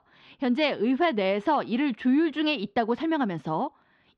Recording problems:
muffled; very slightly; fading above 3.5 kHz

